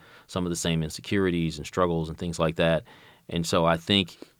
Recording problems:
none

